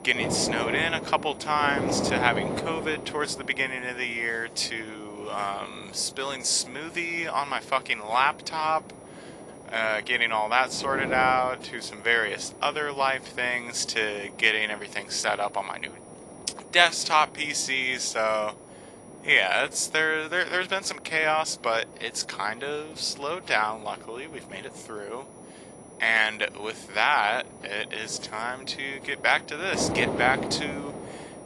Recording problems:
thin; very; fading below 650 Hz
garbled, watery; slightly
wind noise on the microphone; occasional gusts; 15 dB below the speech
high-pitched whine; faint; throughout; 10 kHz, 30 dB below the speech

